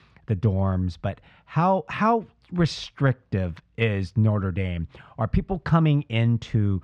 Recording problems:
muffled; slightly; fading above 3 kHz

